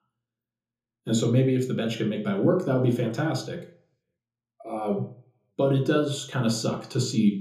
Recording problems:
off-mic speech; far
room echo; slight; dies away in 0.6 s

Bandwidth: 15 kHz